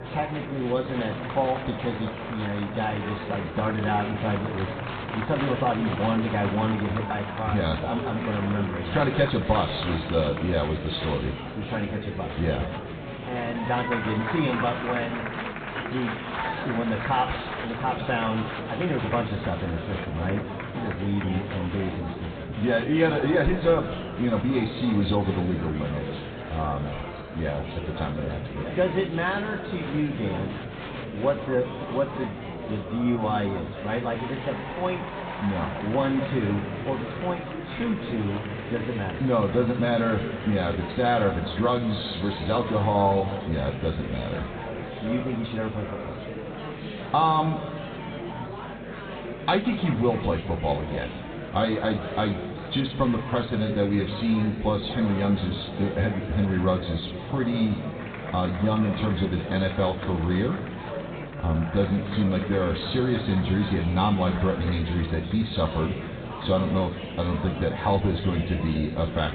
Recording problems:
high frequencies cut off; severe; nothing above 4 kHz
room echo; noticeable; dies away in 1.3 s
off-mic speech; somewhat distant
murmuring crowd; loud; throughout; 8 dB below the speech
electrical hum; faint; throughout; 50 Hz, 30 dB below the speech

